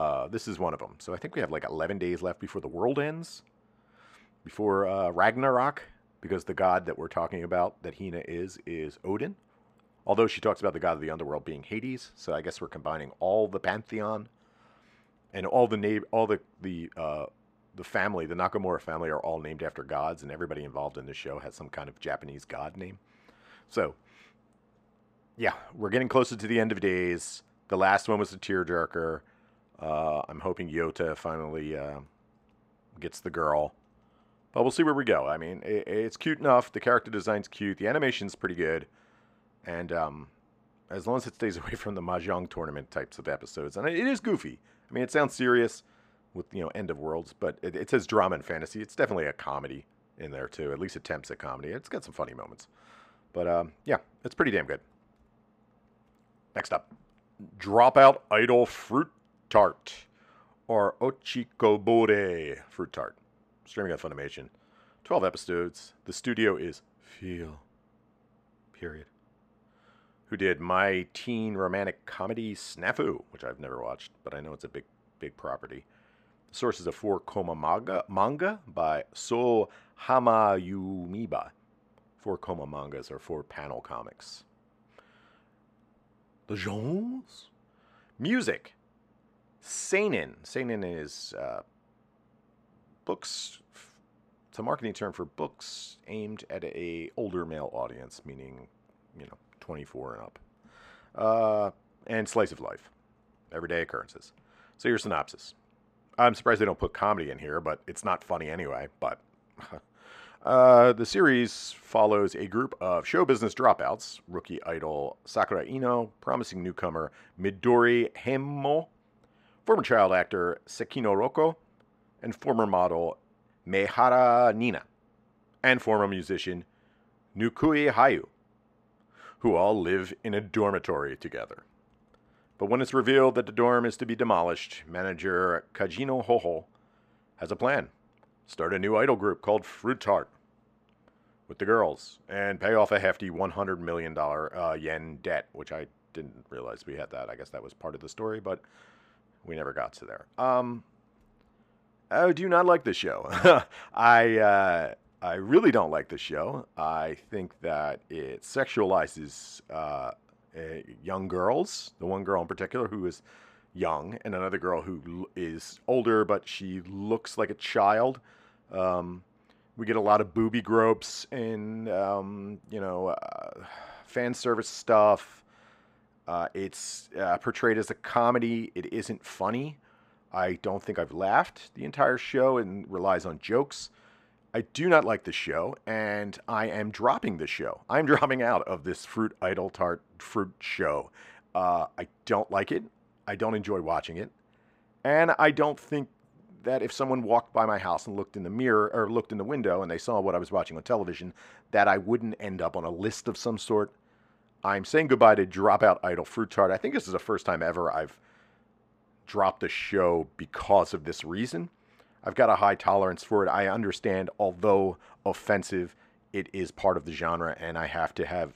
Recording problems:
abrupt cut into speech; at the start

